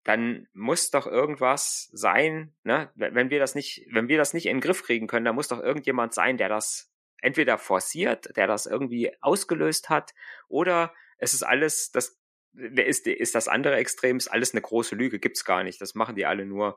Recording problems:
thin; very slightly; fading below 300 Hz

